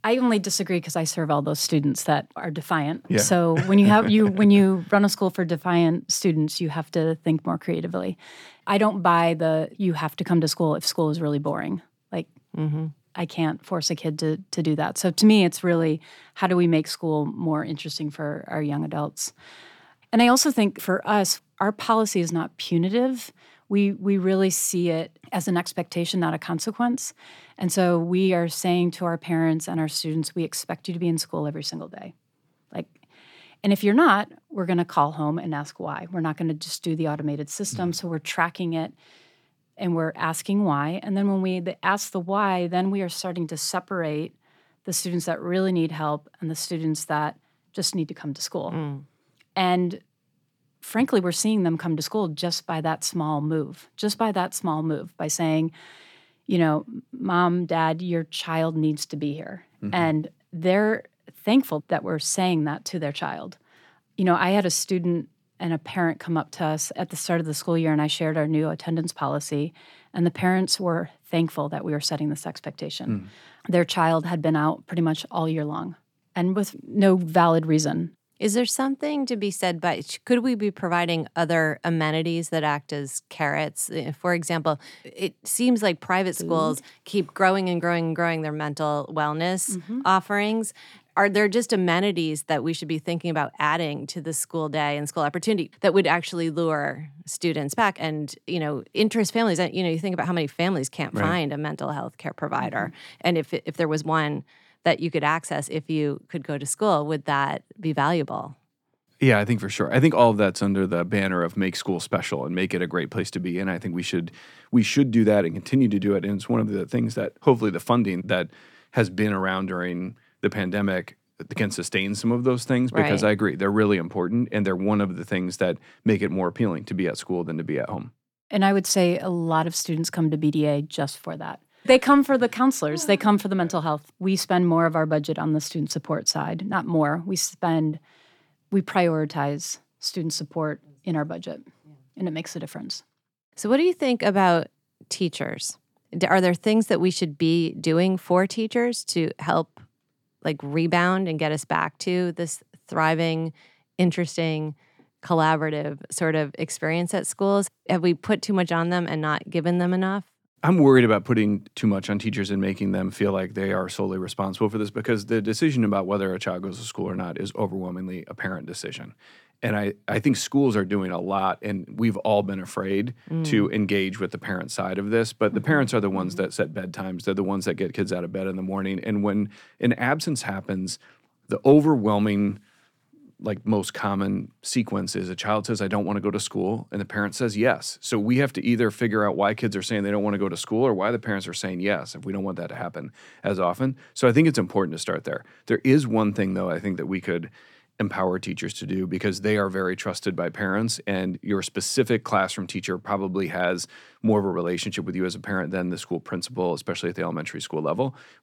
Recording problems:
none

